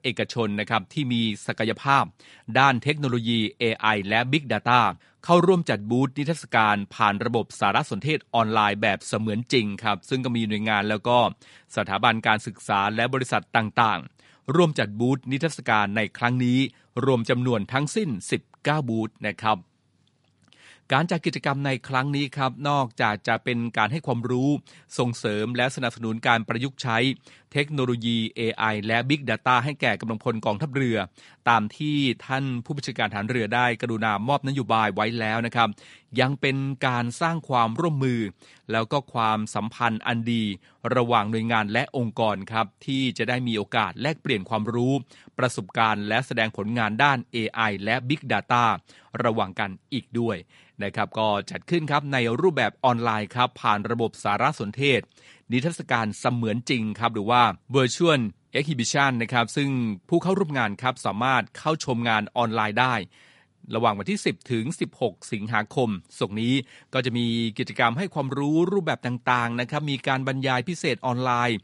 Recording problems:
garbled, watery; slightly; nothing above 11 kHz

